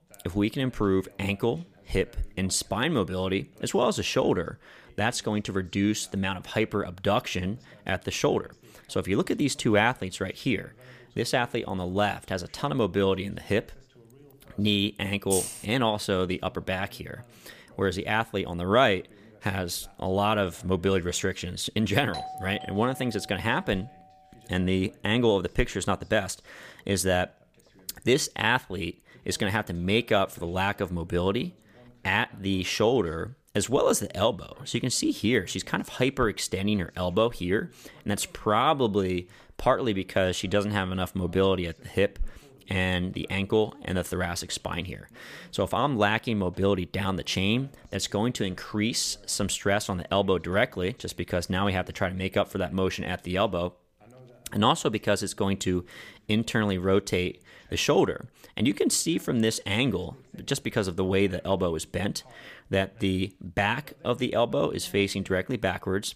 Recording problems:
voice in the background; faint; throughout; 30 dB below the speech
jangling keys; noticeable; at 15 s; peak 2 dB below the speech
doorbell; noticeable; from 22 to 24 s; peak 10 dB below the speech

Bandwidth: 15 kHz